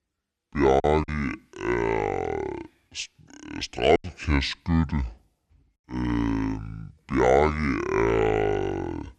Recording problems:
wrong speed and pitch; too slow and too low; 0.6 times normal speed
choppy; occasionally; 2% of the speech affected

